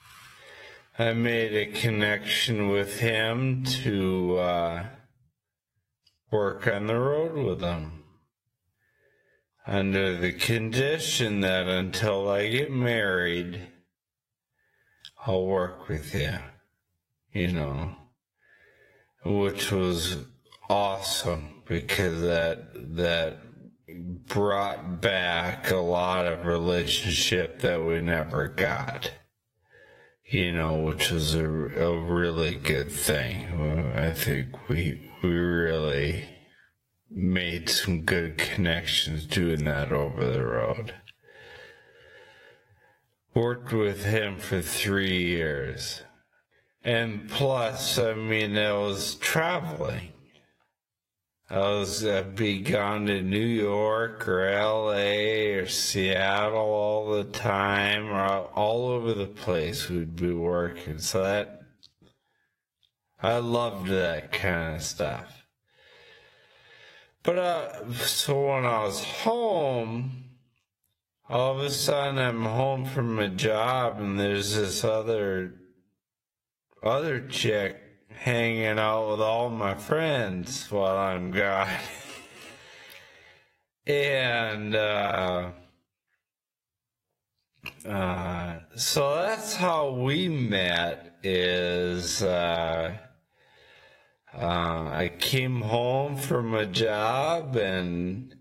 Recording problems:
squashed, flat; heavily
wrong speed, natural pitch; too slow; 0.5 times normal speed
garbled, watery; slightly
uneven, jittery; strongly; from 20 s to 1:35

